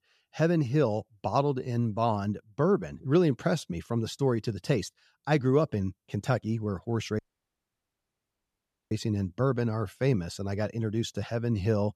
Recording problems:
audio cutting out; at 7 s for 1.5 s

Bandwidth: 13.5 kHz